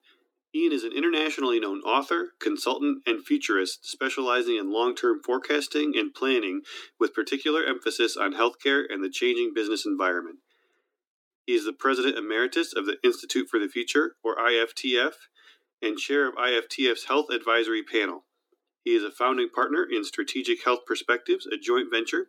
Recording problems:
thin; very slightly; fading below 250 Hz

